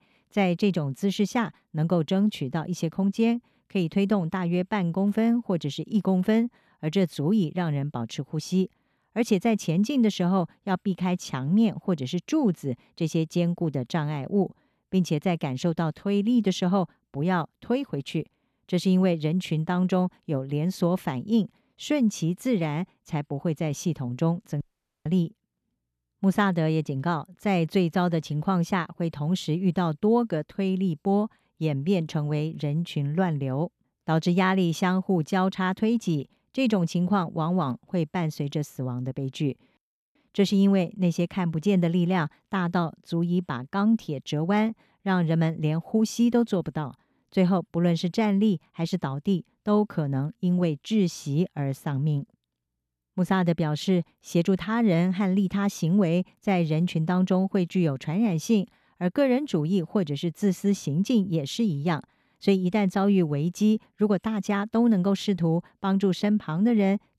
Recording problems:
audio cutting out; at 25 s

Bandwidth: 14 kHz